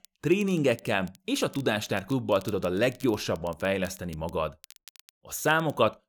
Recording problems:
crackle, like an old record; faint; 25 dB below the speech

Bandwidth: 18.5 kHz